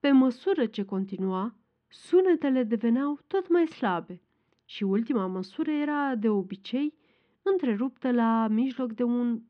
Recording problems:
muffled; slightly; fading above 3.5 kHz

